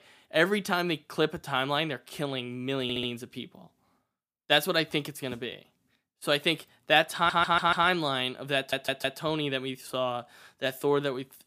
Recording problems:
audio stuttering; at 3 s, at 7 s and at 8.5 s

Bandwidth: 15 kHz